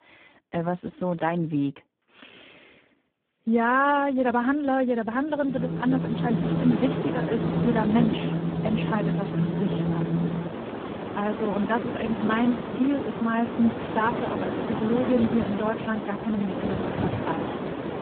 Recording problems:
phone-call audio; poor line
wind in the background; loud; from 6 s on; 3 dB below the speech

